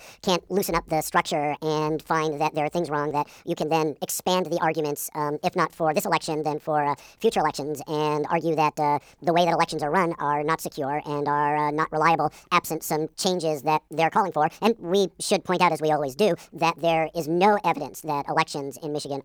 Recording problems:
wrong speed and pitch; too fast and too high; 1.6 times normal speed

